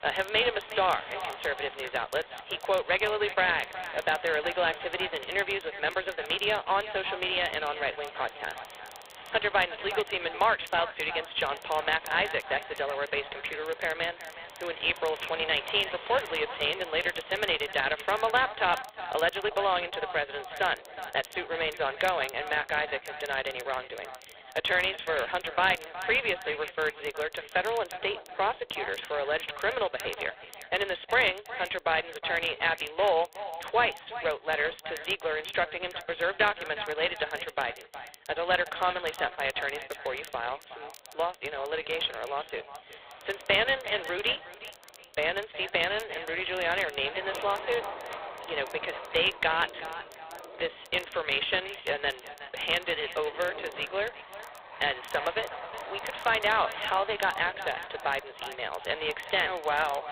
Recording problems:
phone-call audio; poor line
thin; very; fading below 400 Hz
echo of what is said; noticeable; throughout; 370 ms later, 15 dB below the speech
rain or running water; noticeable; throughout; 15 dB below the speech
crackle, like an old record; faint; 25 dB below the speech

